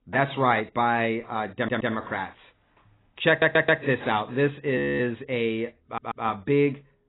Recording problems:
garbled, watery; badly; nothing above 4 kHz
audio stuttering; at 1.5 s, at 3.5 s and at 6 s
audio freezing; at 5 s

